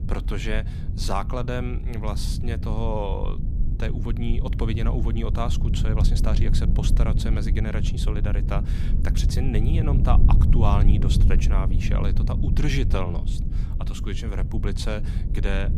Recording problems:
low rumble; loud; throughout; 6 dB below the speech

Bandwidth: 14.5 kHz